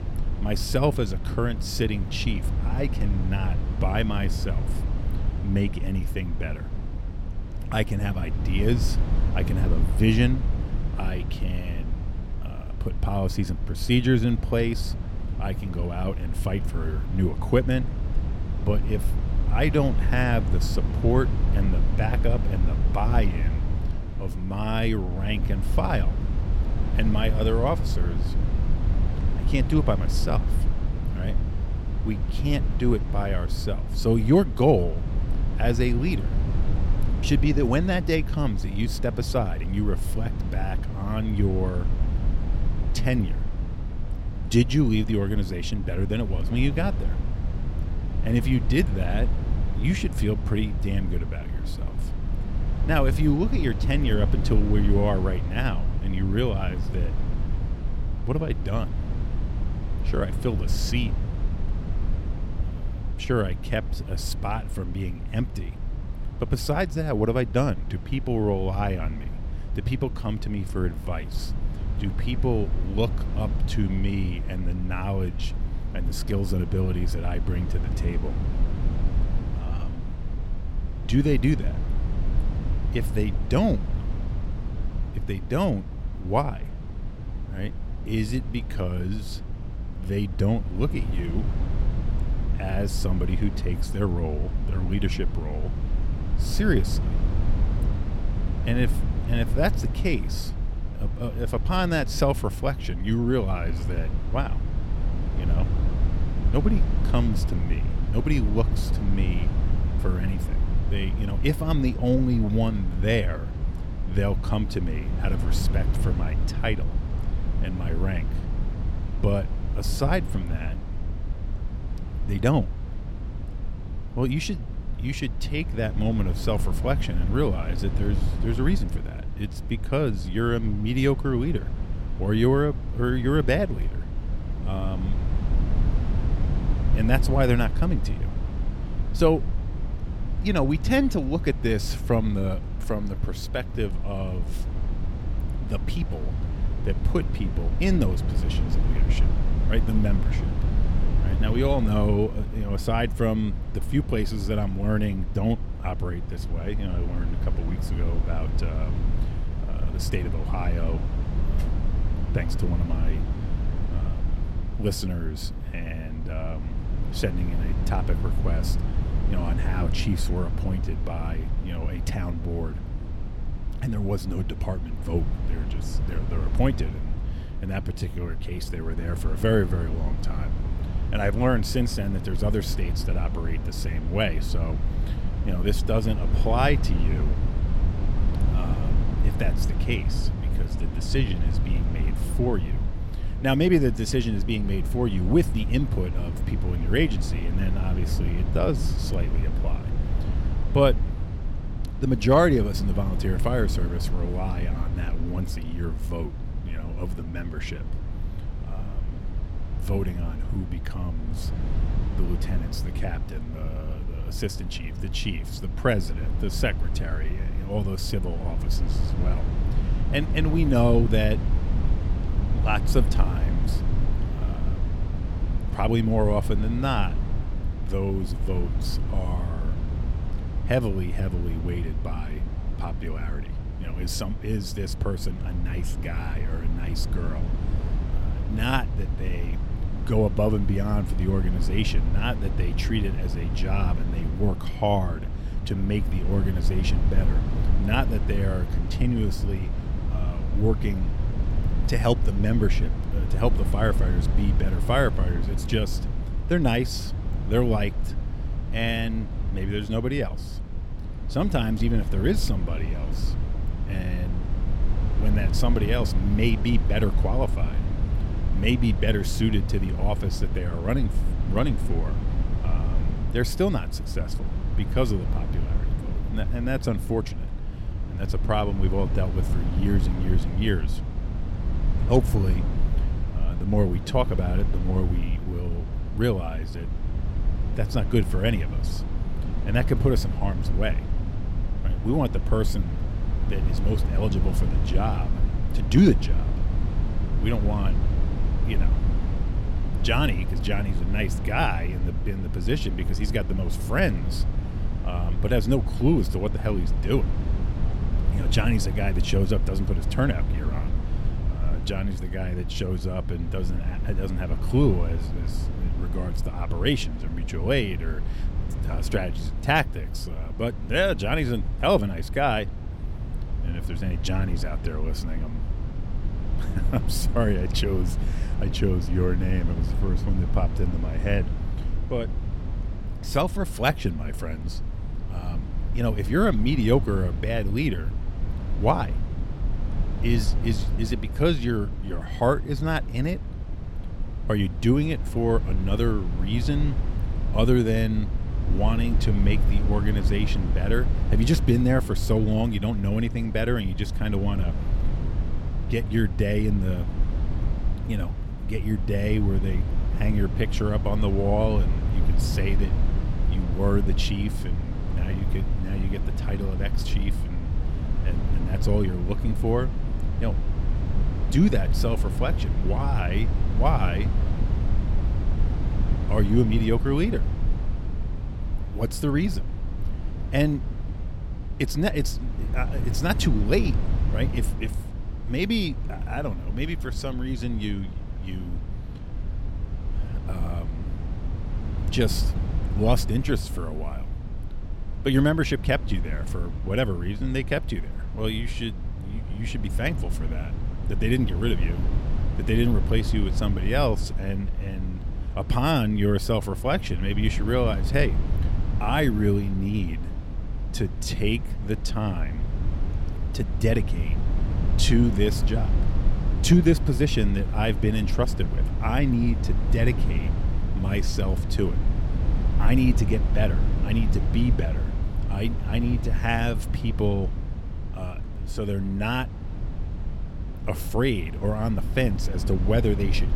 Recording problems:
low rumble; noticeable; throughout; 10 dB below the speech

